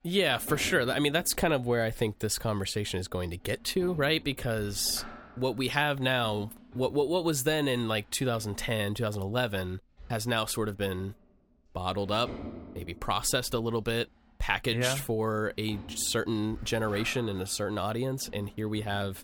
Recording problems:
household noises; noticeable; throughout; 20 dB below the speech

